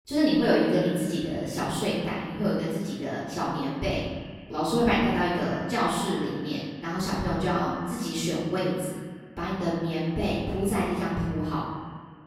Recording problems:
room echo; strong; dies away in 1.2 s
off-mic speech; far
echo of what is said; noticeable; throughout; 140 ms later, 15 dB below the speech

